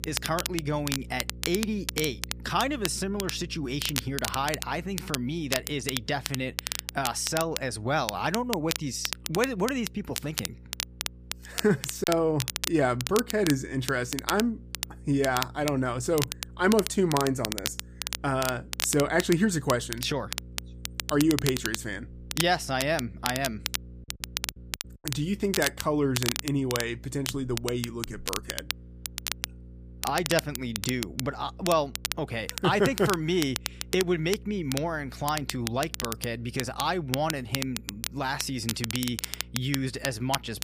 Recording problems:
crackle, like an old record; loud; 5 dB below the speech
electrical hum; faint; throughout; 60 Hz, 30 dB below the speech
choppy; occasionally; at 12 s; 2% of the speech affected

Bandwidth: 15 kHz